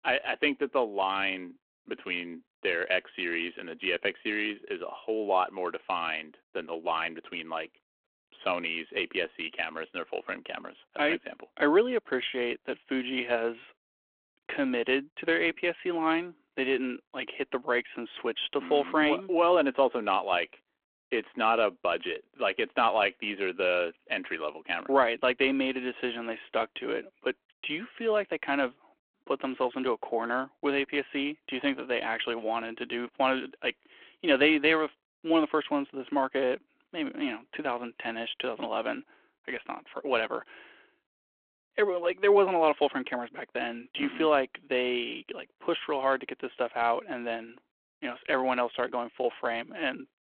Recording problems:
phone-call audio

